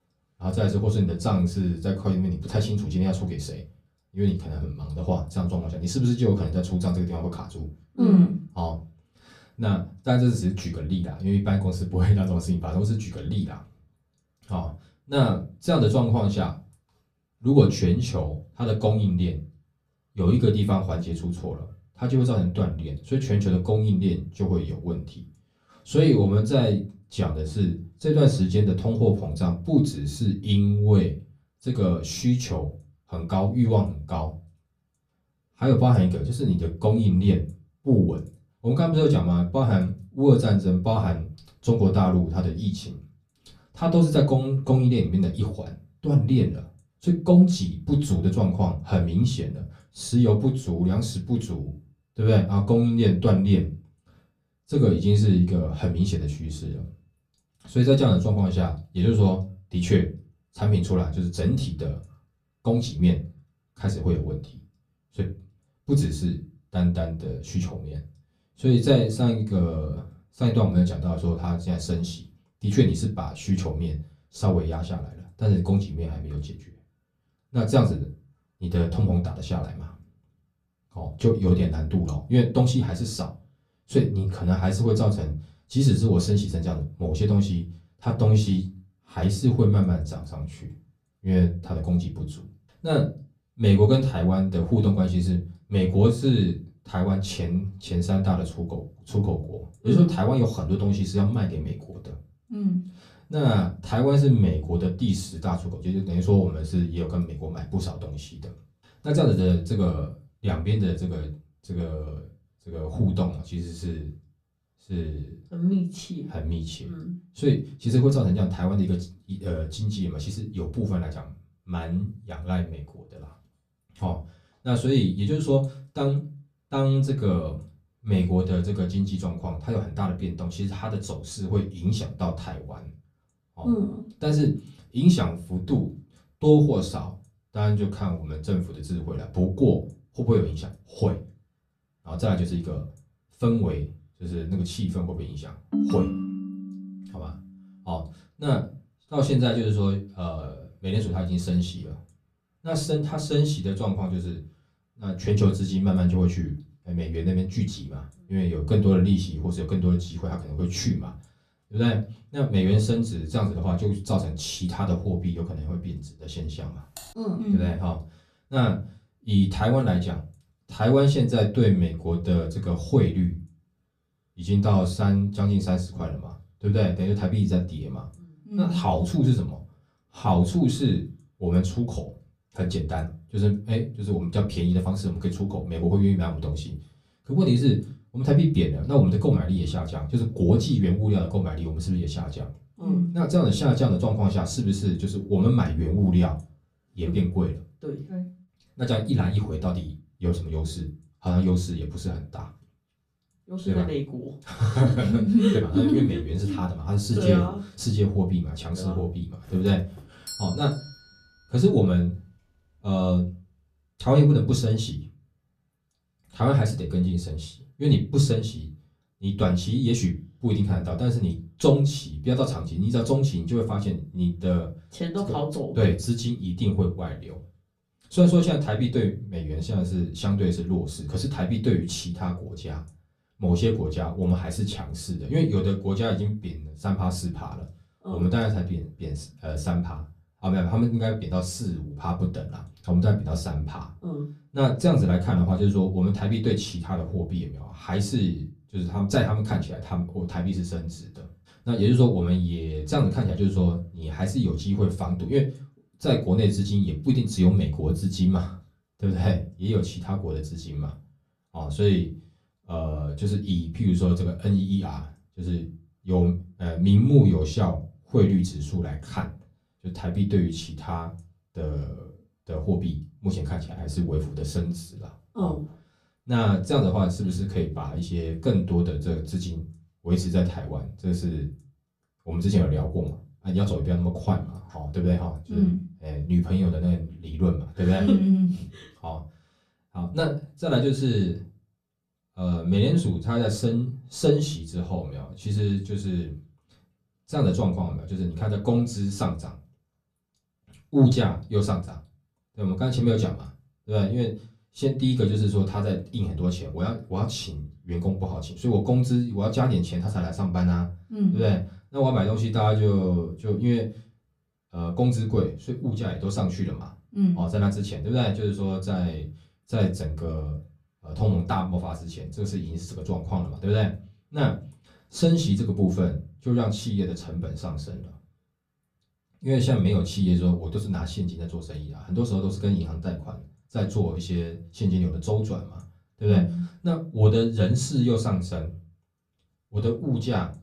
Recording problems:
off-mic speech; far
room echo; very slight; dies away in 0.3 s
phone ringing; loud; from 2:26 to 2:27; peak level with the speech
keyboard typing; faint; at 2:47; peak 20 dB below the speech
doorbell; faint; from 3:29 to 3:31; peak 10 dB below the speech

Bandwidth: 14.5 kHz